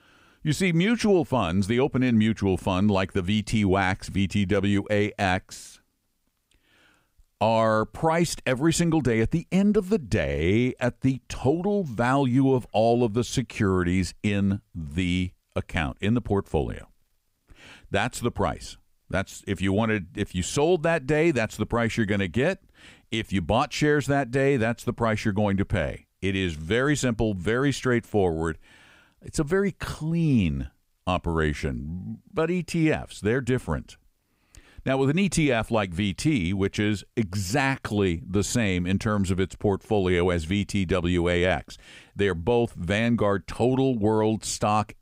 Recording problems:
none

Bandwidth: 15.5 kHz